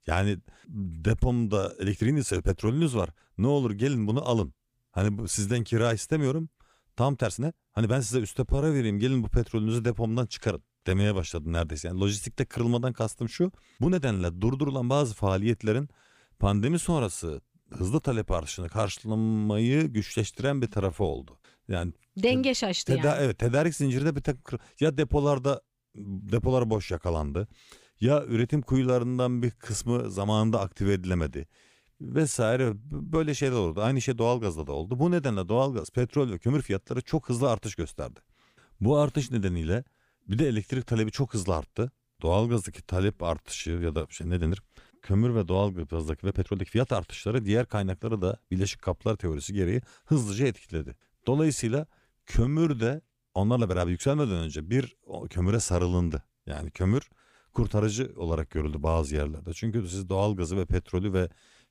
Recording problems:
uneven, jittery; strongly; from 2 to 54 s

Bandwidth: 15 kHz